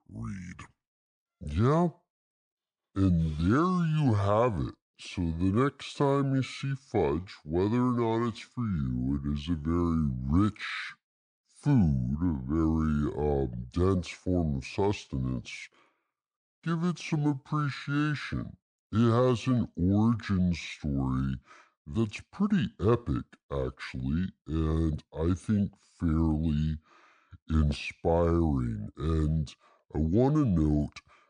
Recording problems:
wrong speed and pitch; too slow and too low; 0.7 times normal speed

